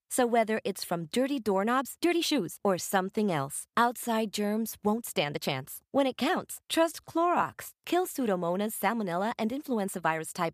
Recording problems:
uneven, jittery; strongly; from 1.5 to 7.5 s

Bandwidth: 15 kHz